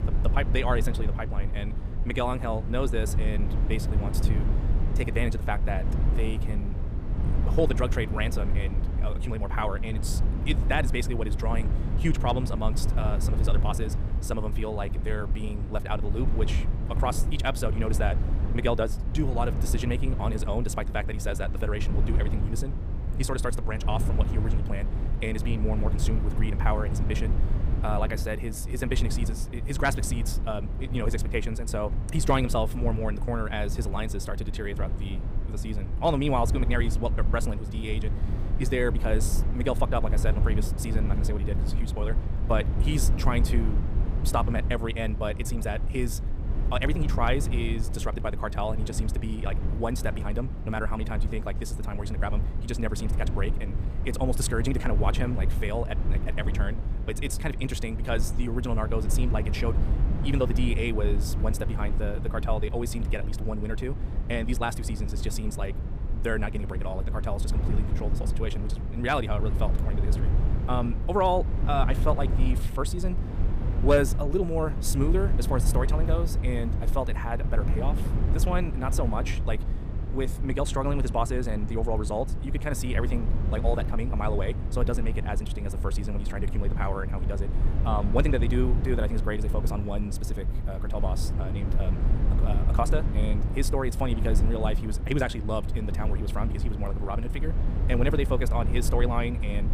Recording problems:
wrong speed, natural pitch; too fast; 1.8 times normal speed
low rumble; loud; throughout; 10 dB below the speech

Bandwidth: 15 kHz